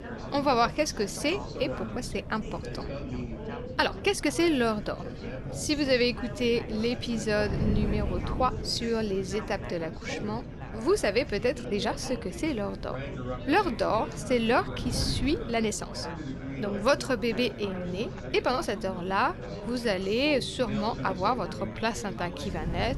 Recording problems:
chatter from many people; noticeable; throughout; 10 dB below the speech
wind noise on the microphone; occasional gusts; 20 dB below the speech
uneven, jittery; strongly; from 1 to 22 s

